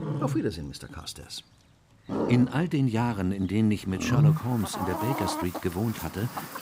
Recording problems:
animal sounds; loud; throughout; 1 dB below the speech

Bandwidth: 15.5 kHz